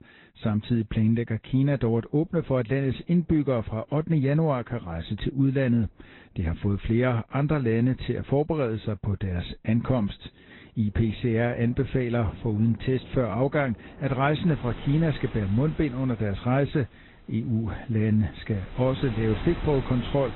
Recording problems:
high frequencies cut off; severe; nothing above 4 kHz
garbled, watery; slightly
rain or running water; noticeable; throughout; 15 dB below the speech

